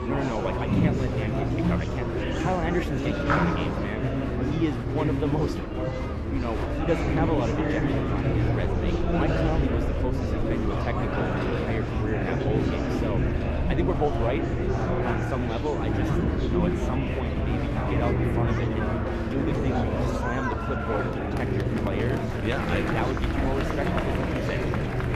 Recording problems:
muffled; slightly; fading above 3.5 kHz
murmuring crowd; very loud; throughout; 4 dB above the speech
low rumble; loud; throughout; 9 dB below the speech

